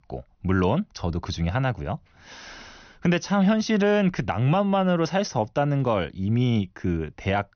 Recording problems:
high frequencies cut off; noticeable; nothing above 6.5 kHz

